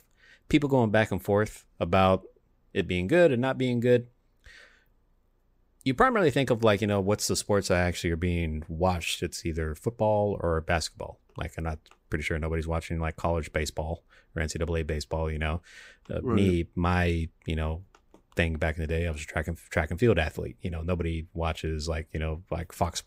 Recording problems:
none

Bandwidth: 15.5 kHz